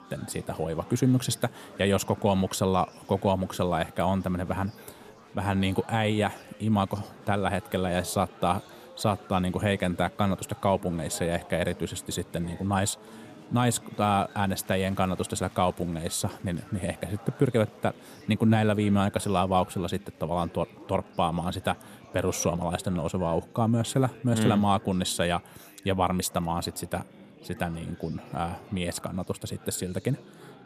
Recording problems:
chatter from many people; faint; throughout; 20 dB below the speech

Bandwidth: 14.5 kHz